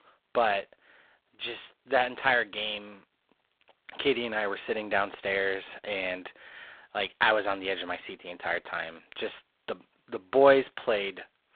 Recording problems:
phone-call audio; poor line; nothing above 3.5 kHz

